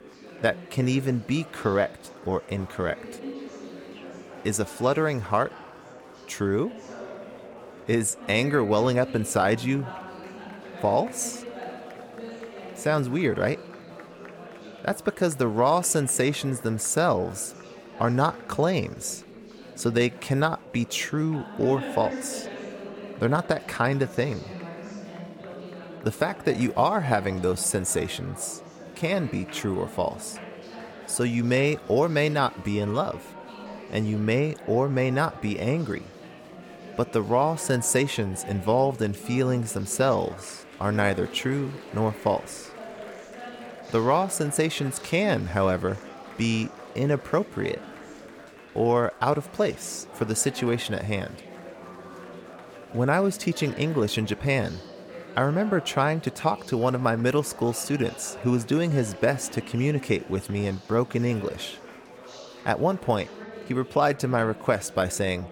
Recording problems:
chatter from many people; noticeable; throughout; 15 dB below the speech

